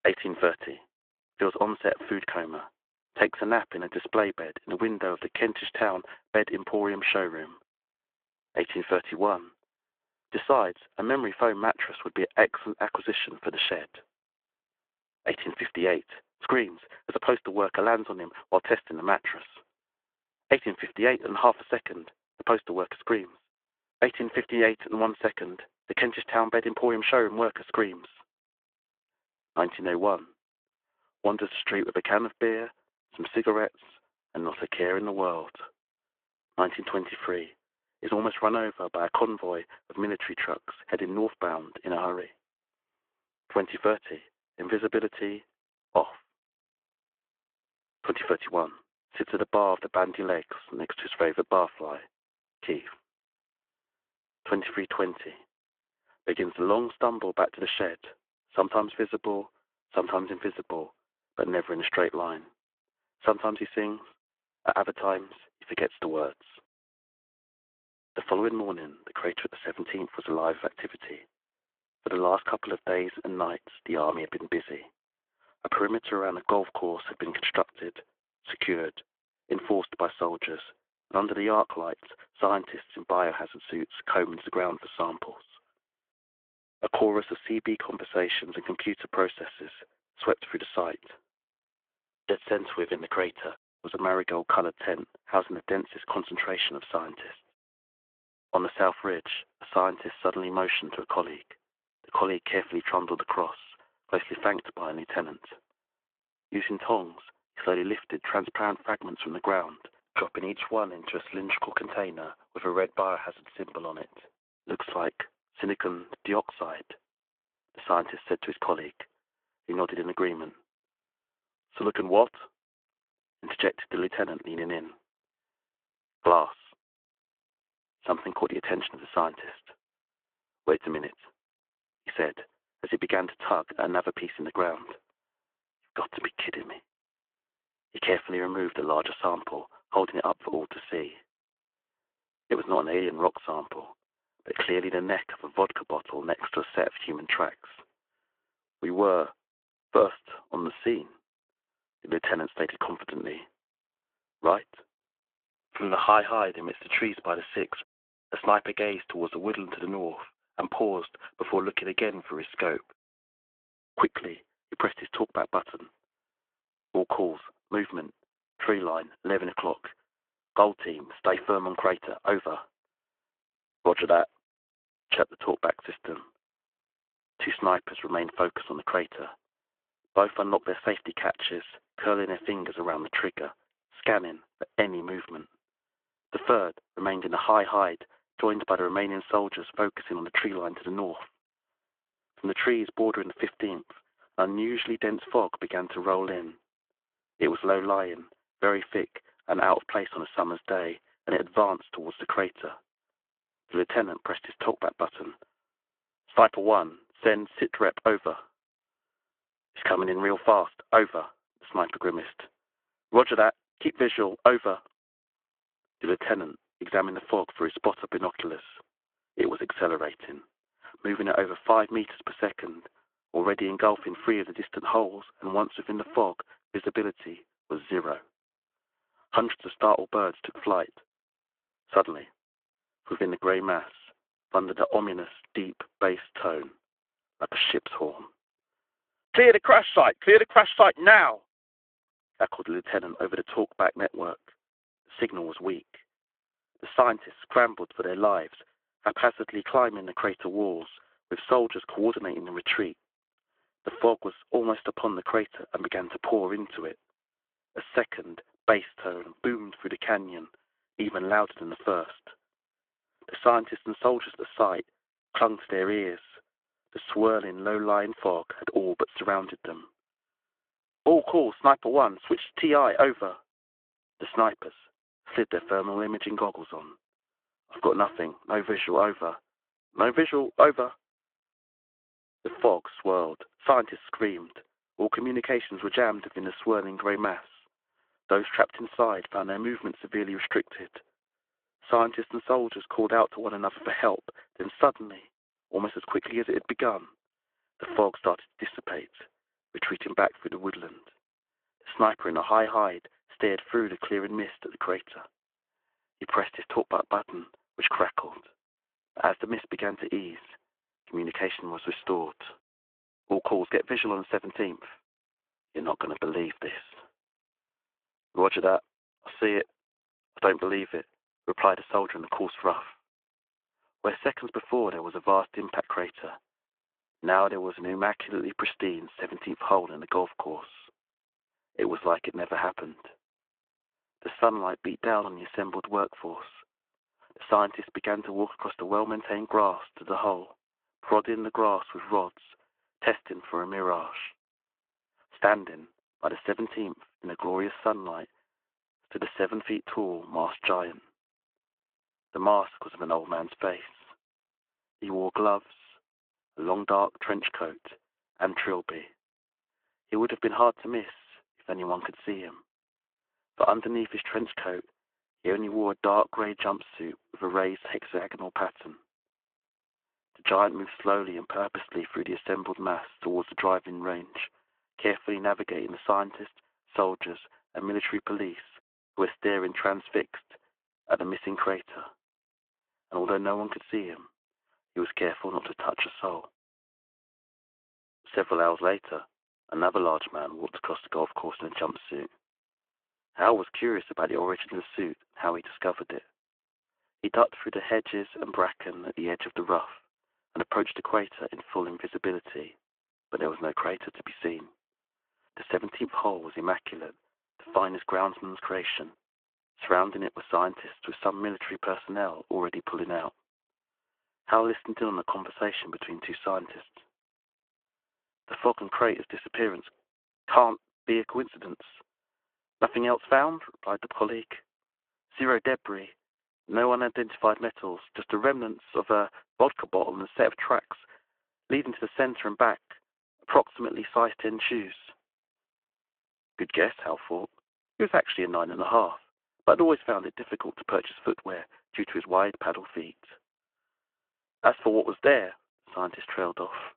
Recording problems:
phone-call audio

